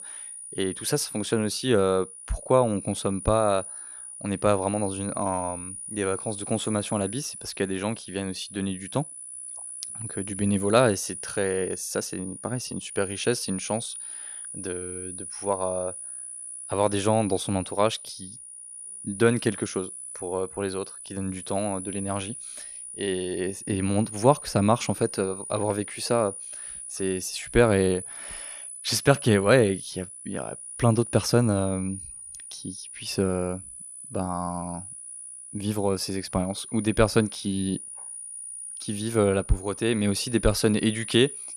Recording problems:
high-pitched whine; loud; throughout; 9.5 kHz, 10 dB below the speech

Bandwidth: 14.5 kHz